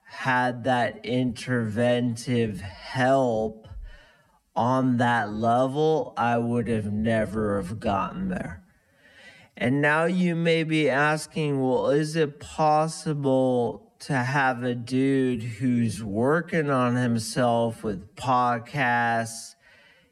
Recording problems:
wrong speed, natural pitch; too slow; 0.5 times normal speed

